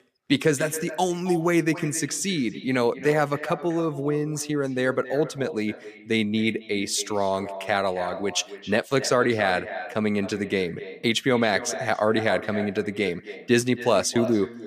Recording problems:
echo of what is said; noticeable; throughout; 270 ms later, 15 dB below the speech

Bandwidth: 14.5 kHz